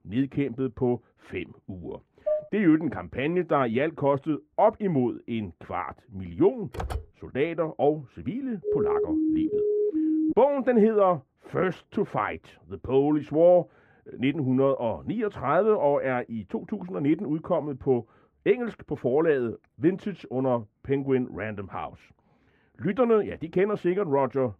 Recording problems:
muffled; very; fading above 3 kHz
clattering dishes; noticeable; at 2.5 s; peak 4 dB below the speech
keyboard typing; noticeable; at 6.5 s; peak 9 dB below the speech
siren; loud; from 8.5 to 10 s; peak 1 dB above the speech

